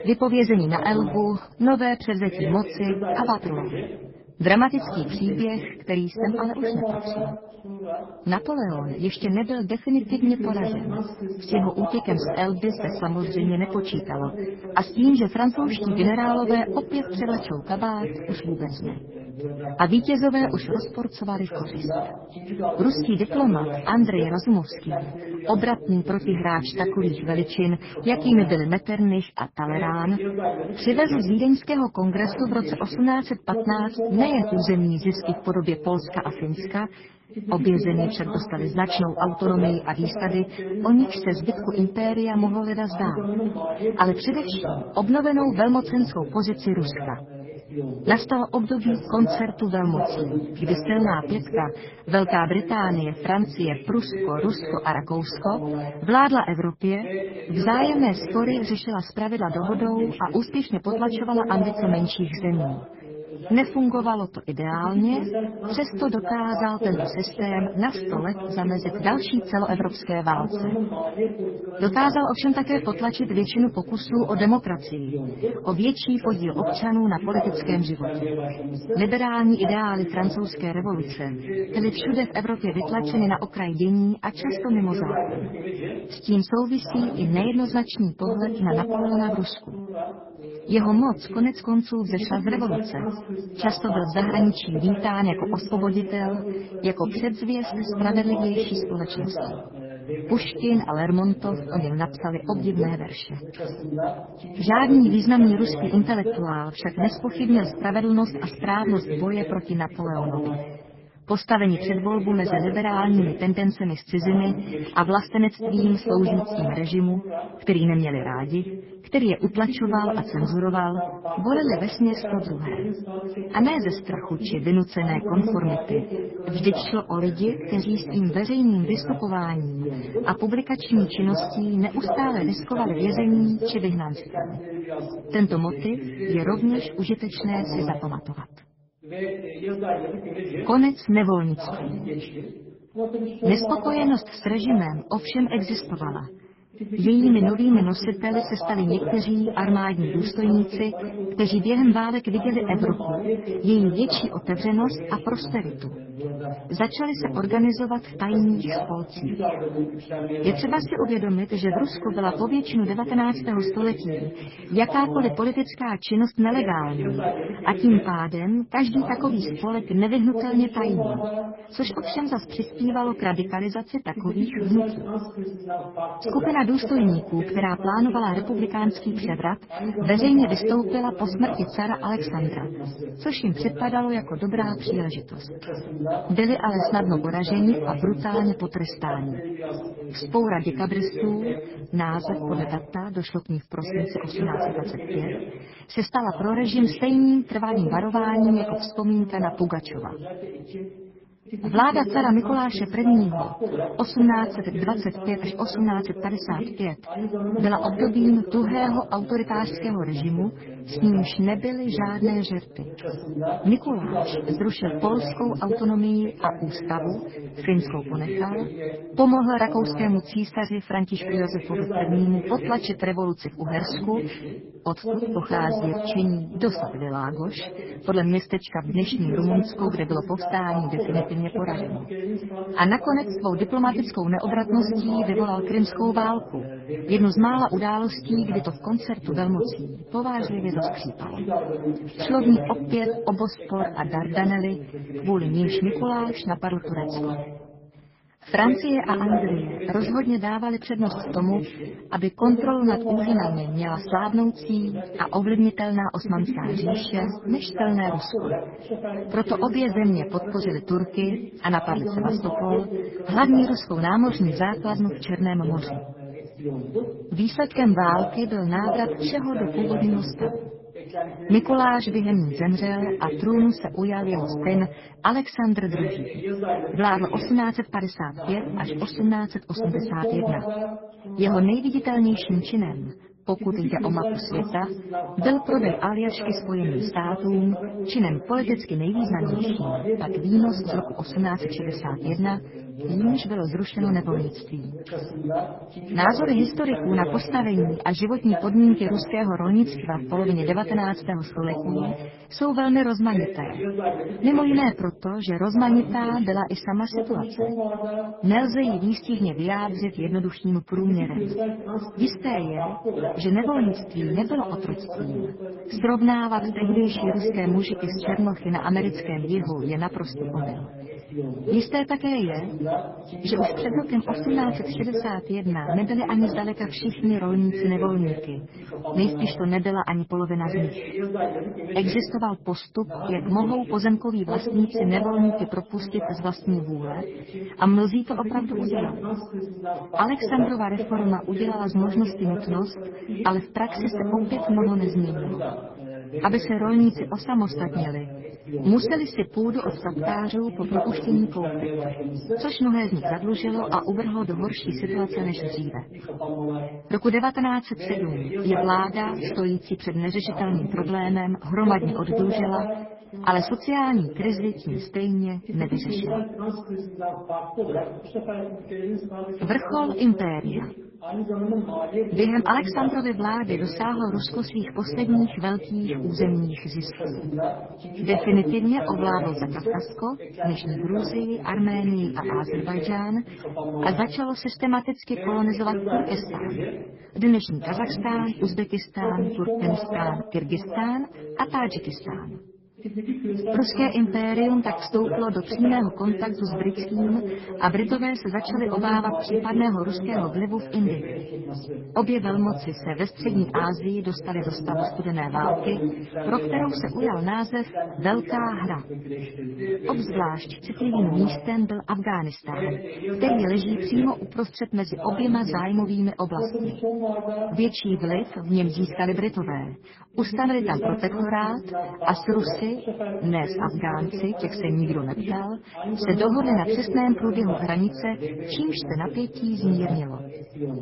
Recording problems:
garbled, watery; badly; nothing above 5.5 kHz
voice in the background; loud; throughout; 6 dB below the speech

